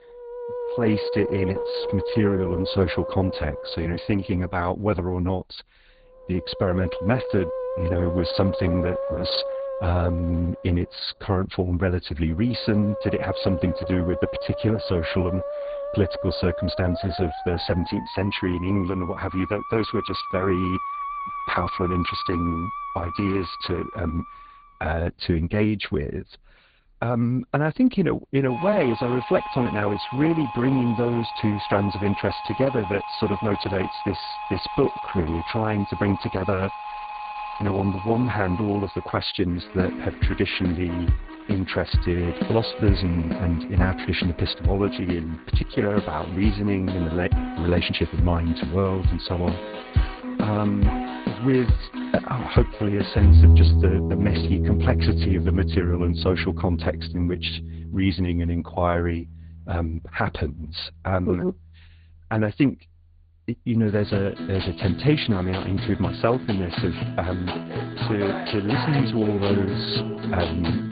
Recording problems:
garbled, watery; badly
high frequencies cut off; severe; nothing above 4.5 kHz
background music; loud; throughout; 3 dB below the speech

